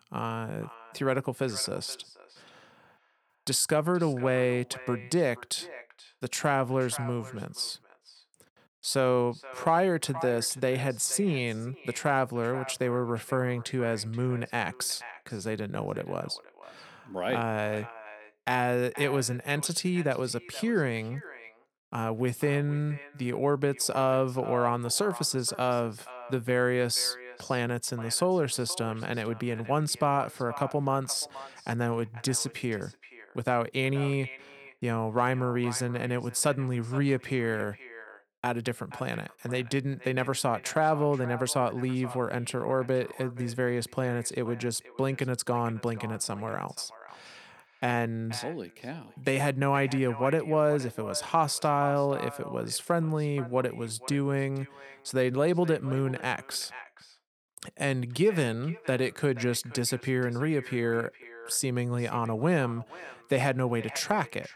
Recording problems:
echo of what is said; noticeable; throughout; 480 ms later, 15 dB below the speech

